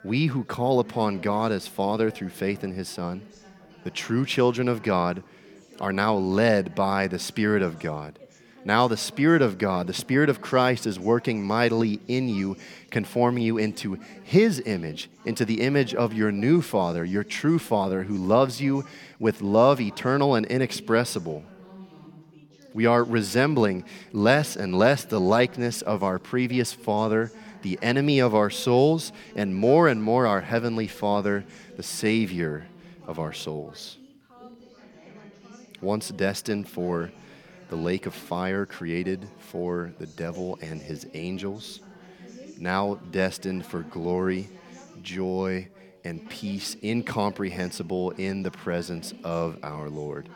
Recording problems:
background chatter; faint; throughout; 3 voices, 20 dB below the speech

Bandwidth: 17.5 kHz